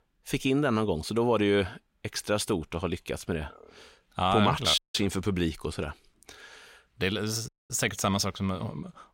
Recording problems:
audio cutting out; at 5 s and at 7.5 s

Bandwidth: 16 kHz